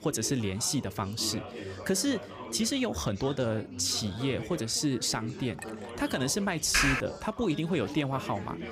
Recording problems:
background chatter; noticeable; throughout; 4 voices, 10 dB below the speech
clattering dishes; faint; at 5.5 s; peak 15 dB below the speech
keyboard typing; loud; at 6.5 s; peak 4 dB above the speech

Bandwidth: 15 kHz